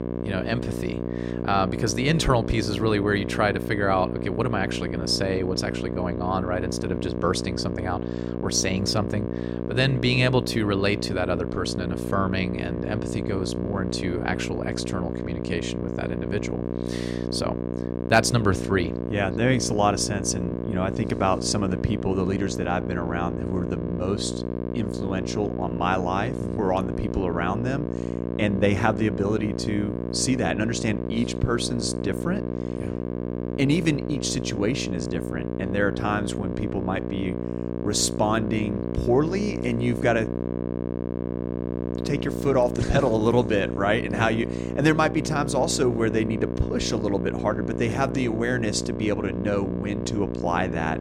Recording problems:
electrical hum; loud; throughout; 60 Hz, 7 dB below the speech

